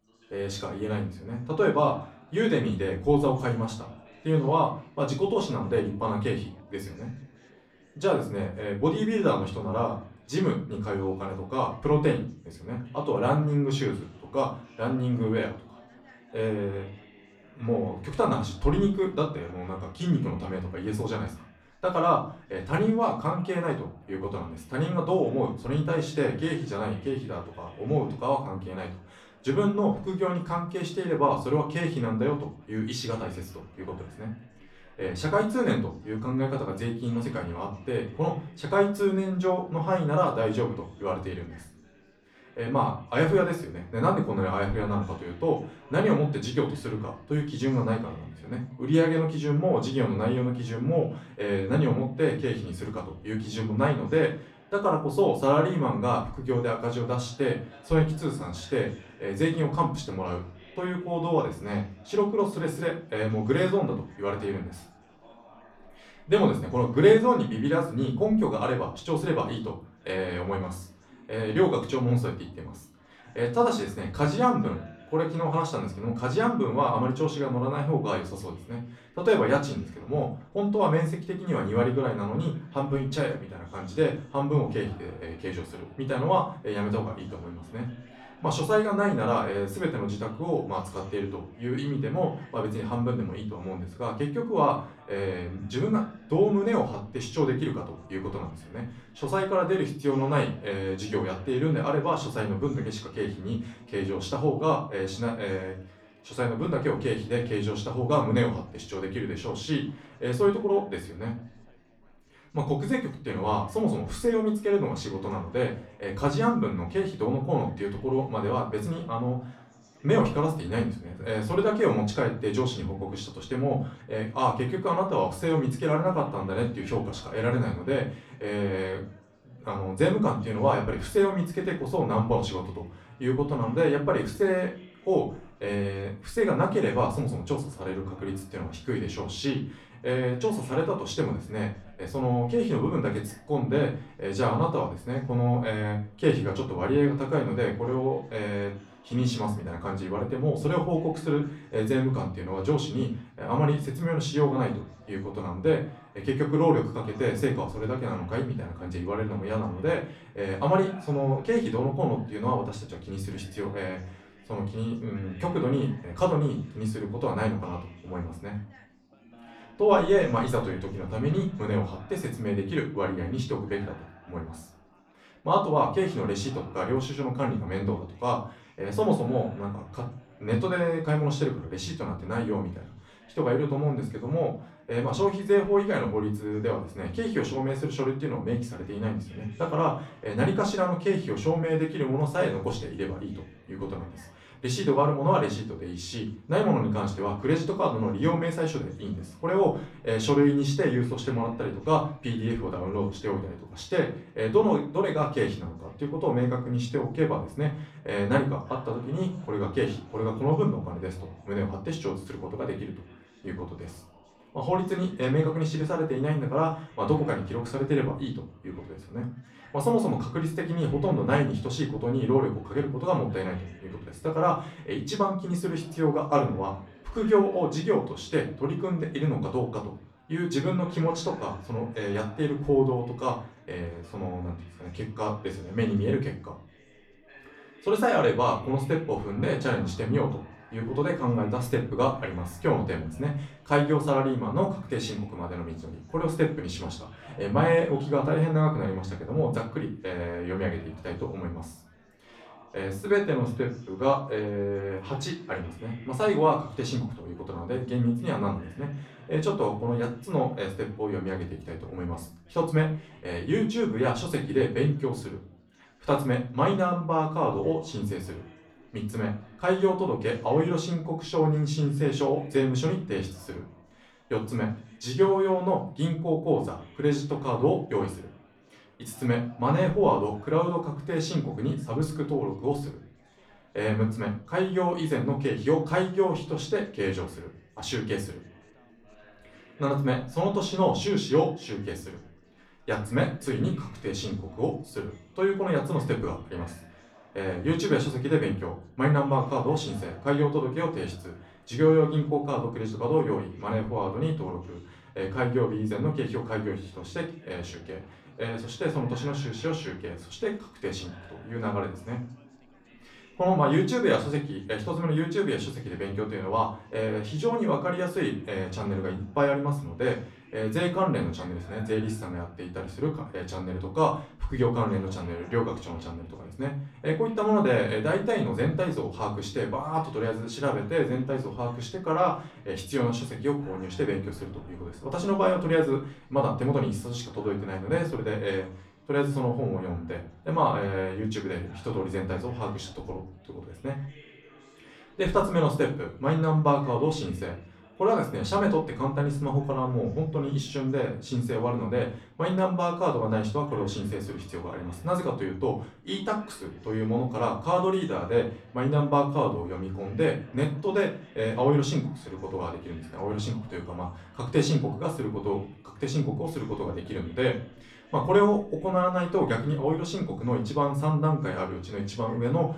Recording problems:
off-mic speech; far
room echo; slight; dies away in 0.4 s
background chatter; faint; throughout; 4 voices, 25 dB below the speech

